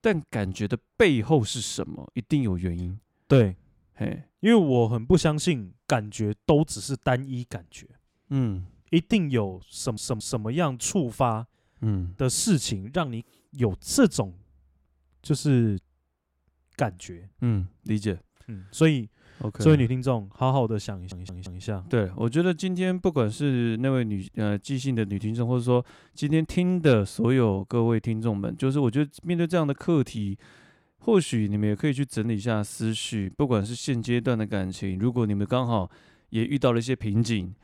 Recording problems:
audio stuttering; at 9.5 s and at 21 s

